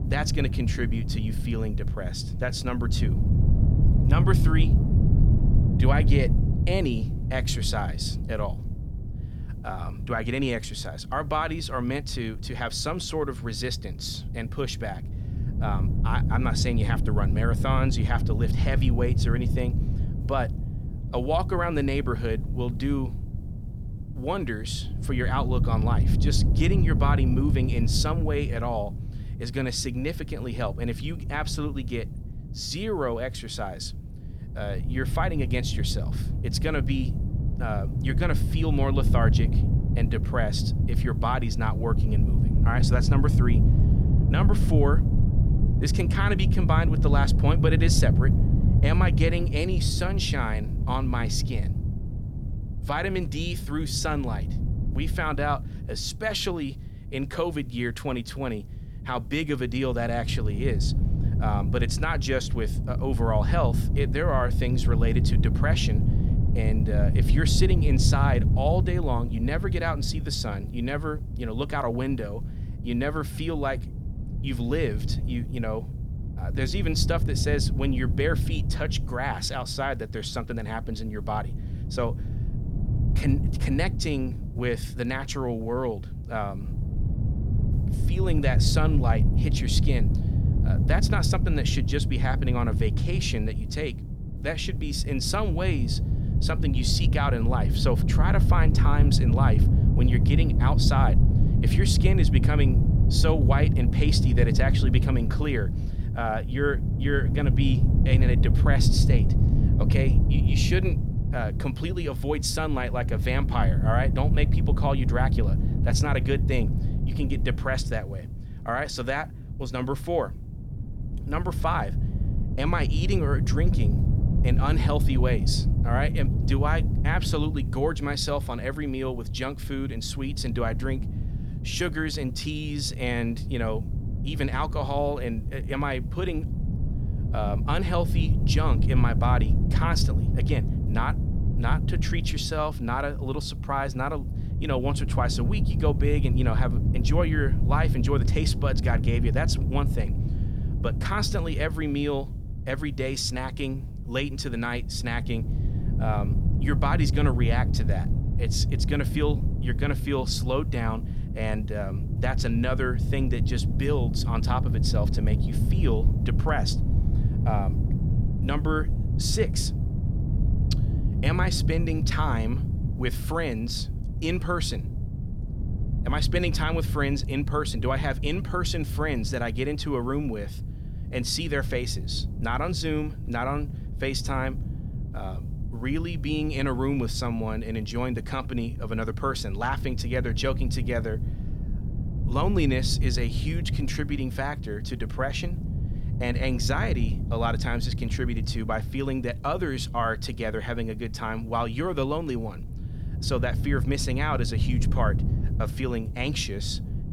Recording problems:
wind noise on the microphone; heavy; 9 dB below the speech

